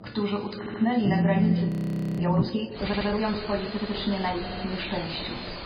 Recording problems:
garbled, watery; badly; nothing above 4 kHz
room echo; noticeable; dies away in 1.9 s
off-mic speech; somewhat distant
alarms or sirens; very faint; throughout; 1 dB below the speech
audio stuttering; 4 times, first at 0.5 s
audio freezing; at 1.5 s for 0.5 s

